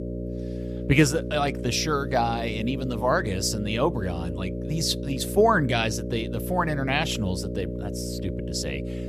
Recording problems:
electrical hum; noticeable; throughout; 60 Hz, 10 dB below the speech

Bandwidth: 14.5 kHz